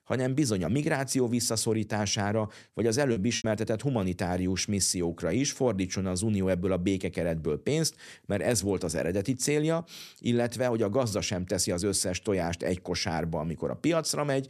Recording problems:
choppy; occasionally; at 3 s; 4% of the speech affected

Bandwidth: 13.5 kHz